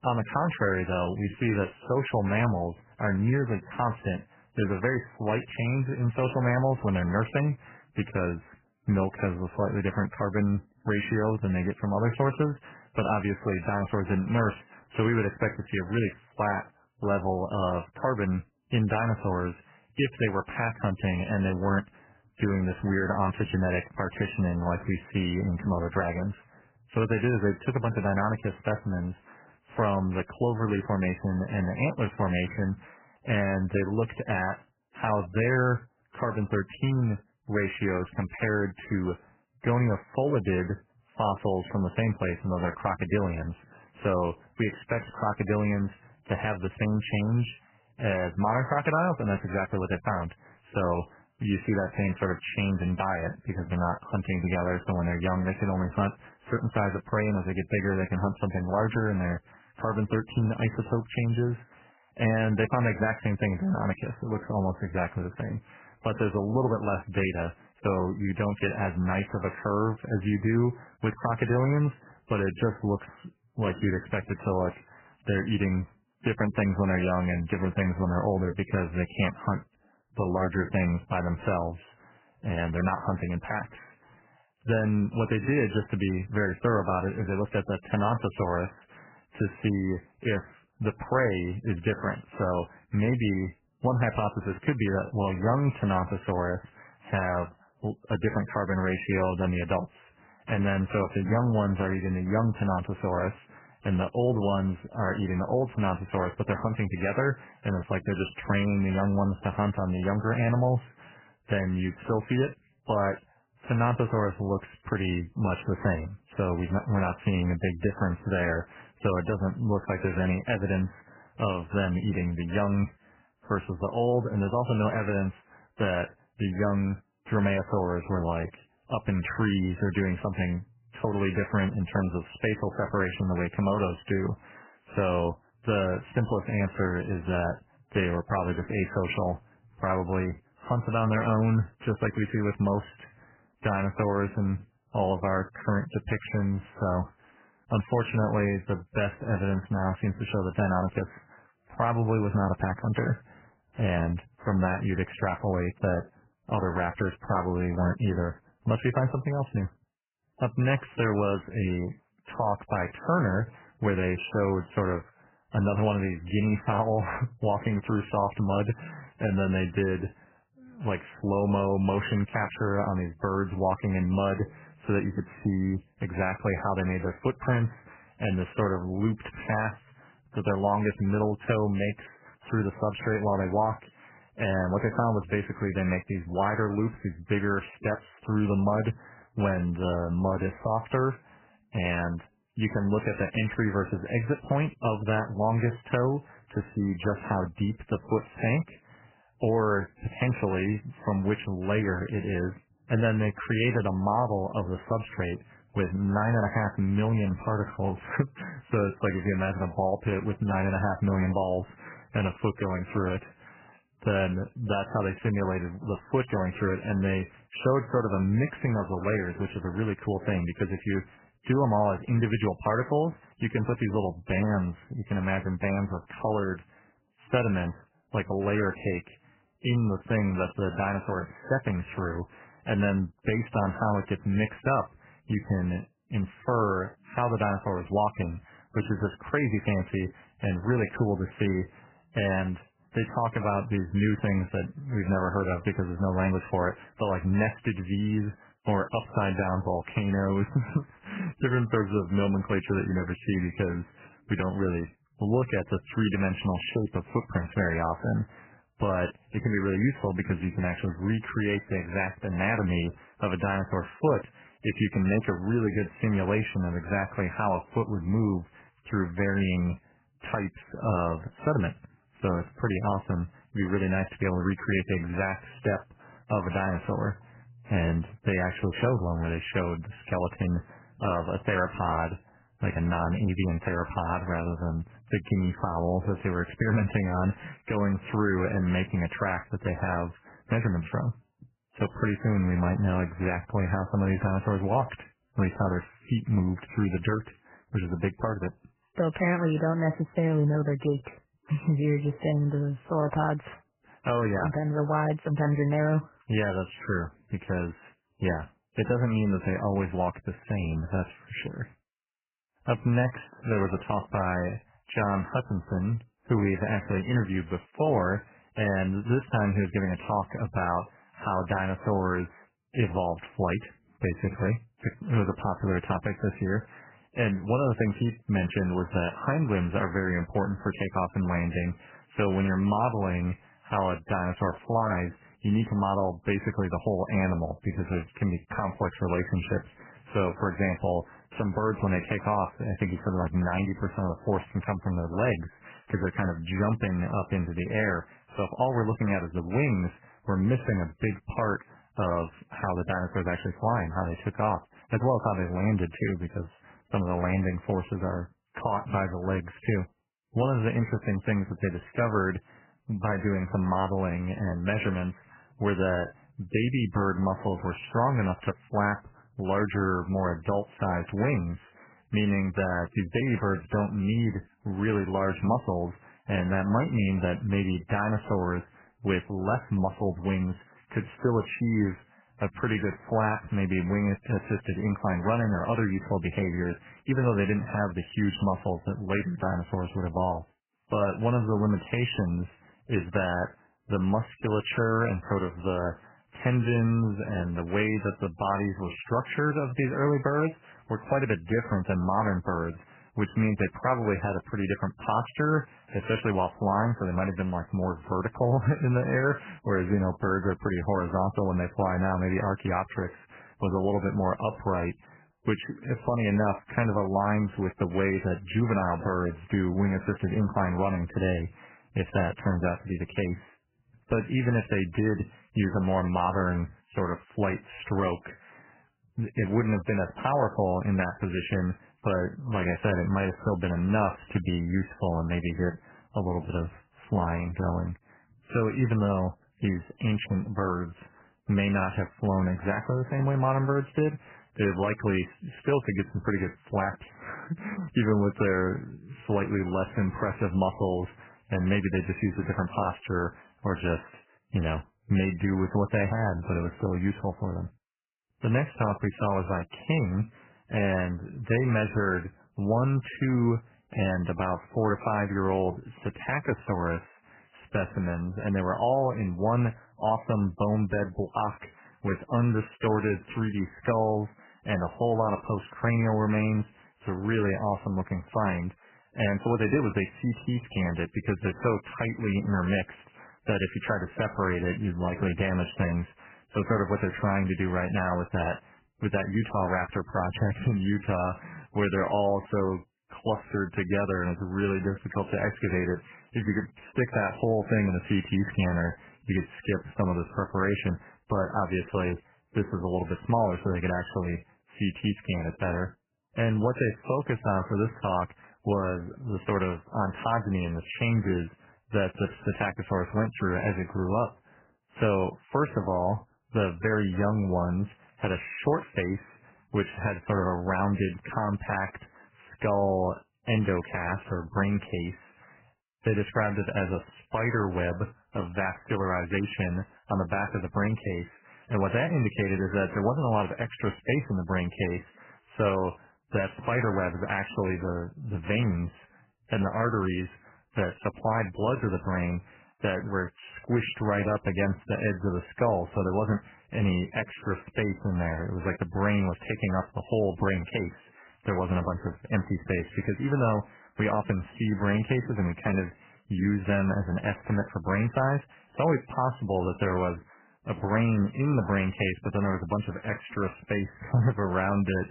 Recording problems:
garbled, watery; badly; nothing above 3 kHz

